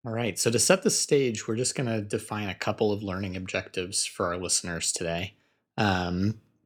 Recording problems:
none

